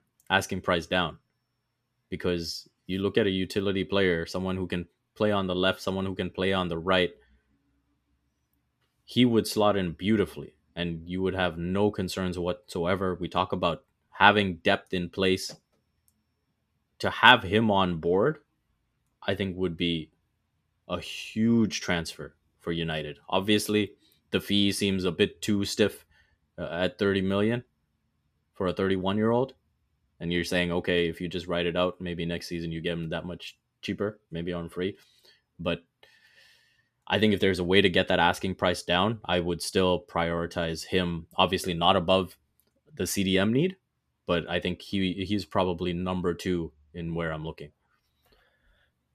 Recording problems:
none

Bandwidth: 14.5 kHz